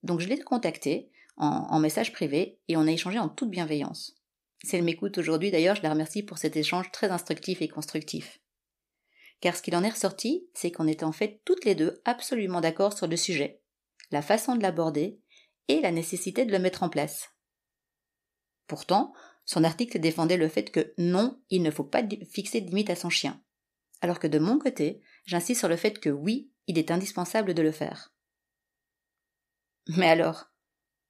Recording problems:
none

